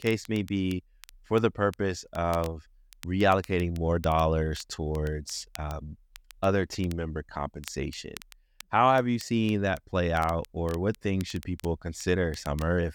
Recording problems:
crackle, like an old record; faint; 20 dB below the speech

